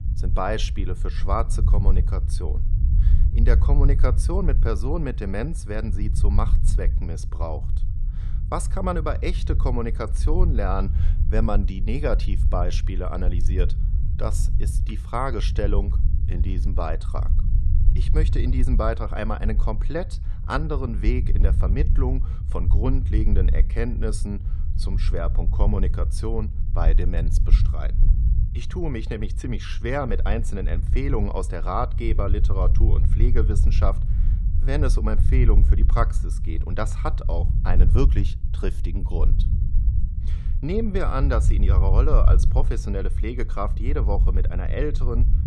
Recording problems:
low rumble; noticeable; throughout; 10 dB below the speech

